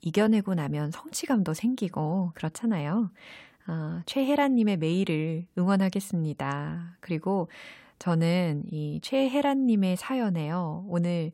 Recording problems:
none

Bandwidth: 16 kHz